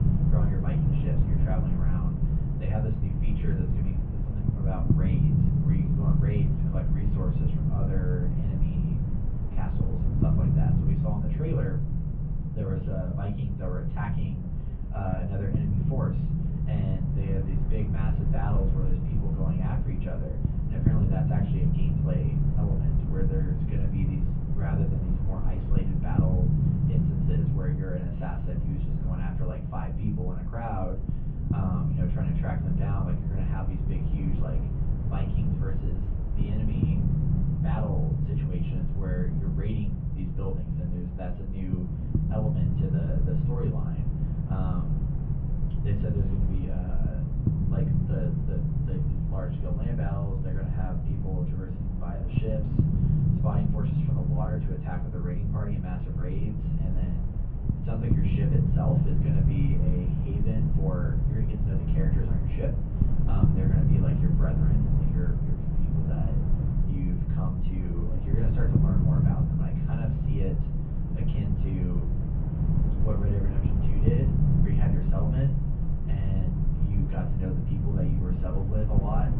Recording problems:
off-mic speech; far
muffled; very; fading above 3 kHz
room echo; slight; dies away in 0.3 s
low rumble; very loud; throughout; 2 dB above the speech

